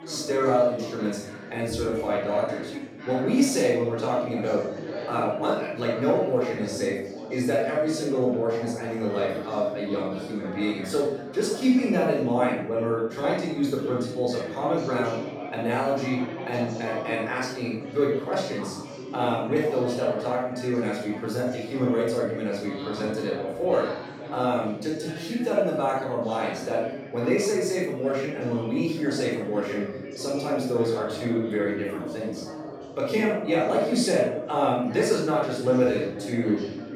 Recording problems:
off-mic speech; far
room echo; noticeable; dies away in 0.6 s
background chatter; noticeable; throughout; 4 voices, 10 dB below the speech

